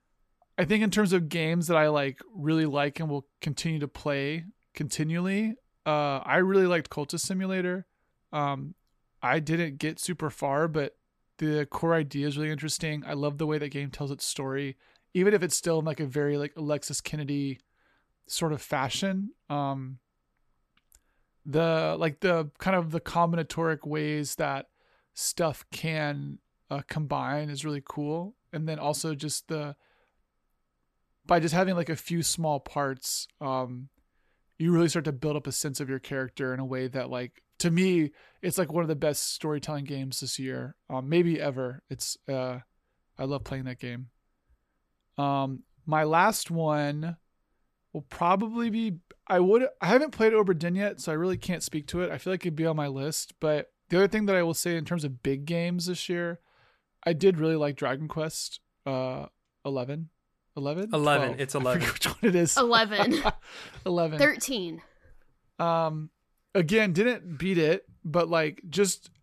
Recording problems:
none

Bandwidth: 13.5 kHz